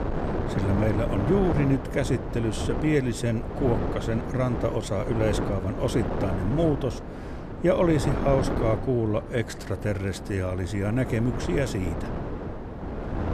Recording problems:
wind noise on the microphone; heavy; 5 dB below the speech

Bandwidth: 14.5 kHz